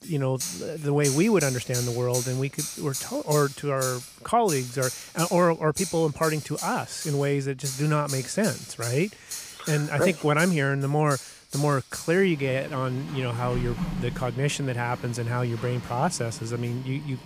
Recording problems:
household noises; loud; throughout; 8 dB below the speech

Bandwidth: 15 kHz